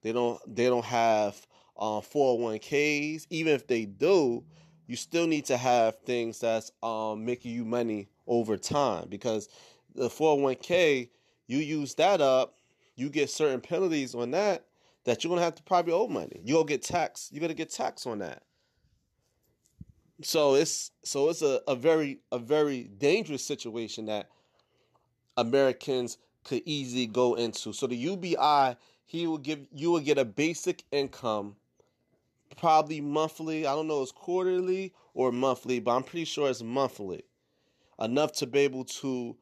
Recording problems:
none

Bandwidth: 13.5 kHz